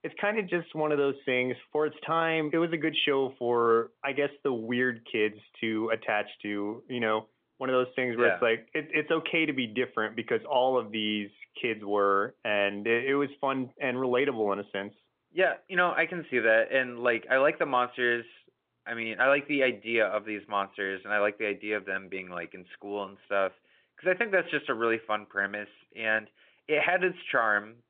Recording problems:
phone-call audio; nothing above 3.5 kHz

